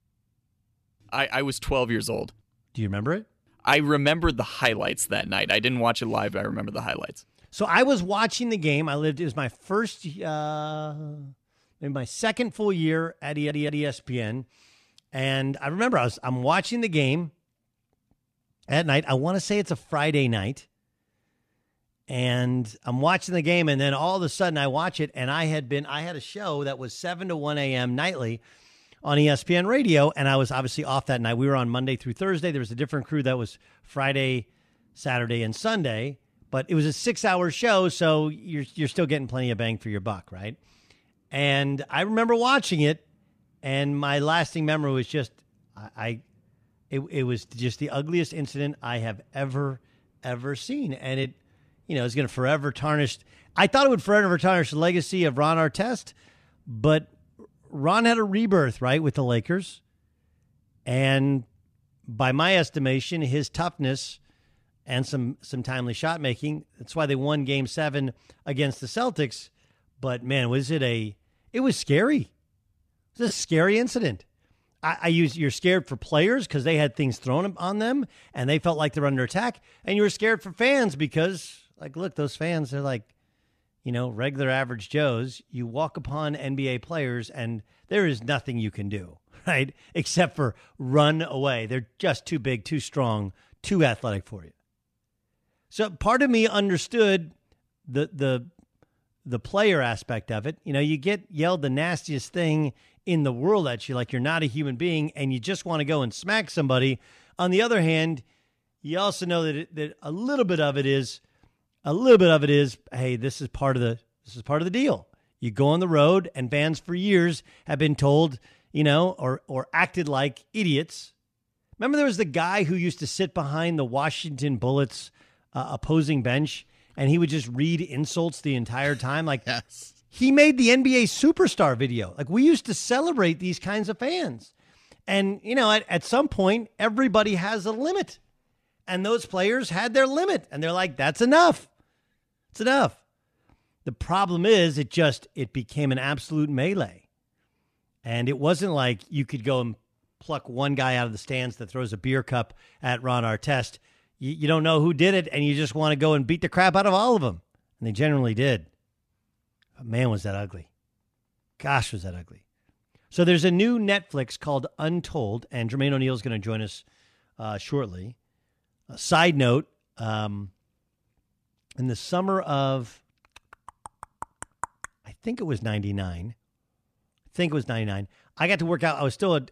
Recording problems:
audio stuttering; at 13 s

